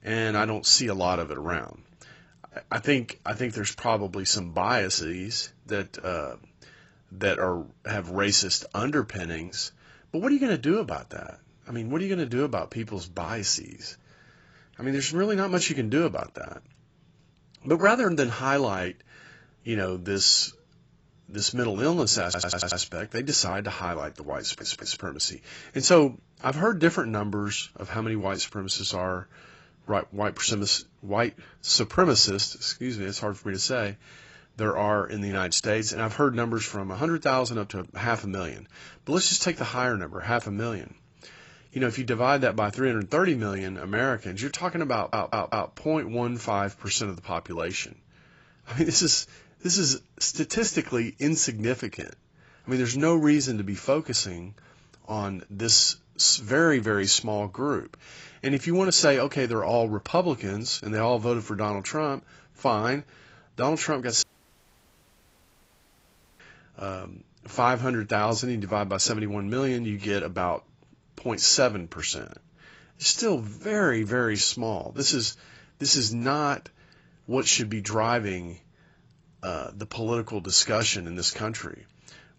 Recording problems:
garbled, watery; badly; nothing above 7.5 kHz
audio stuttering; at 22 s, at 24 s and at 45 s
audio cutting out; at 1:04 for 2 s

